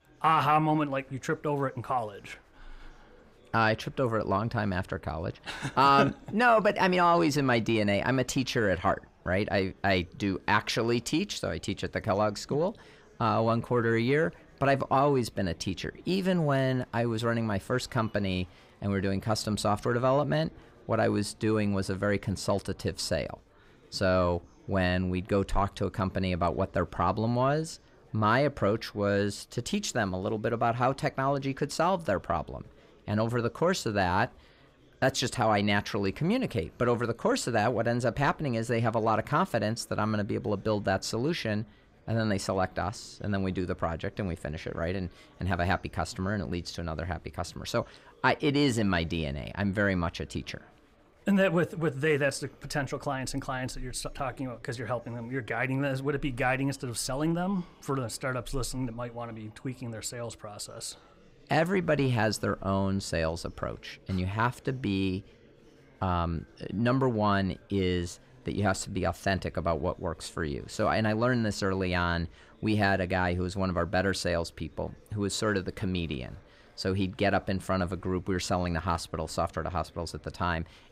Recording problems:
chatter from many people; faint; throughout; 30 dB below the speech

